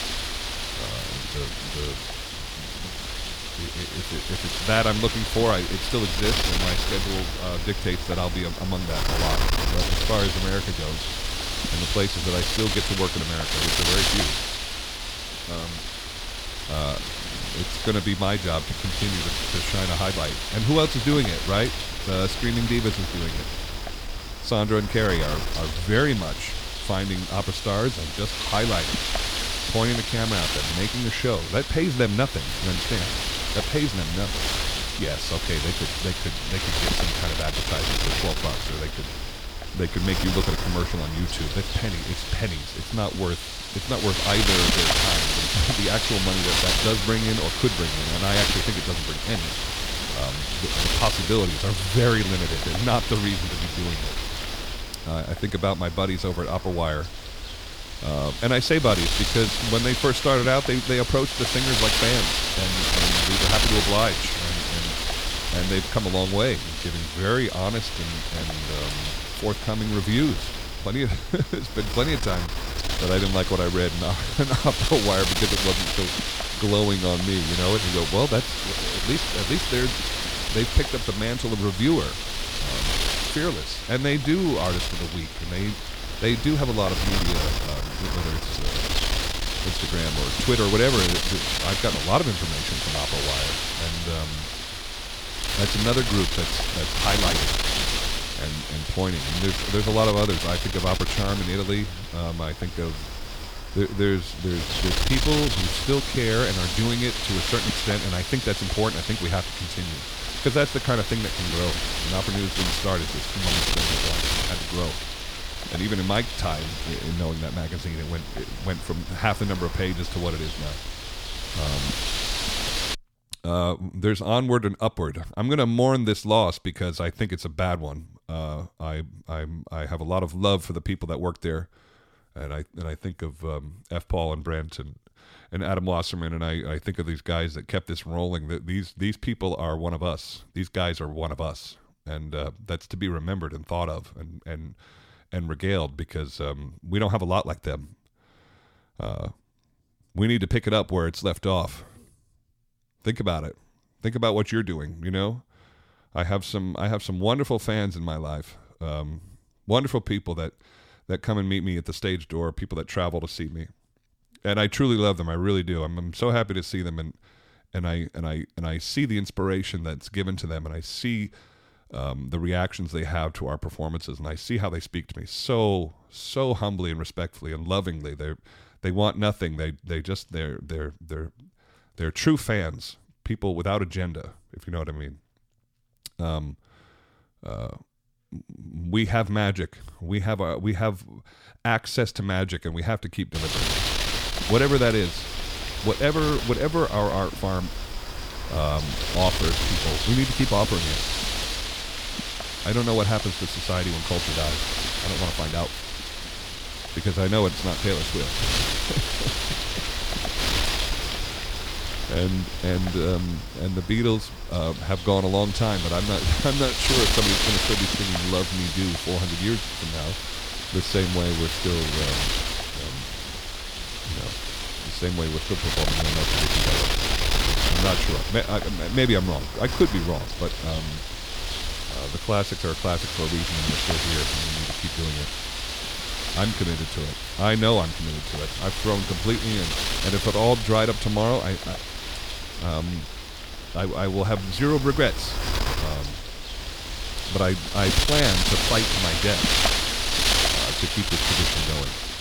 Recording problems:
wind noise on the microphone; heavy; until 2:03 and from 3:13 on; 2 dB above the speech

